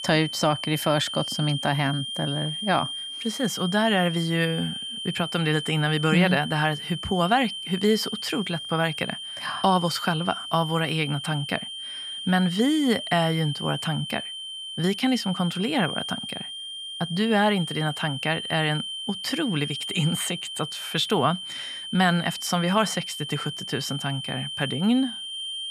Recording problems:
high-pitched whine; loud; throughout; 3 kHz, 6 dB below the speech

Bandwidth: 15 kHz